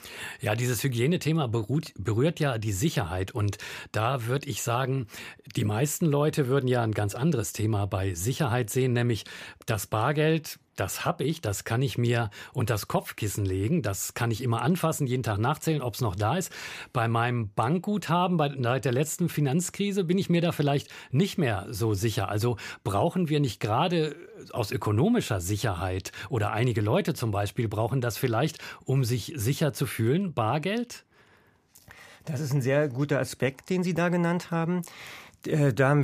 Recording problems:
abrupt cut into speech; at the end

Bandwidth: 15 kHz